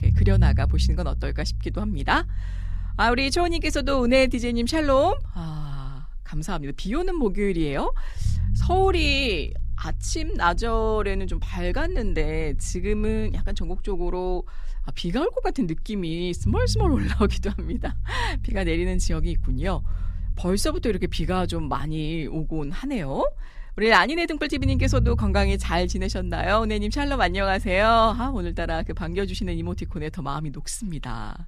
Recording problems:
low rumble; faint; throughout; 20 dB below the speech

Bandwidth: 14.5 kHz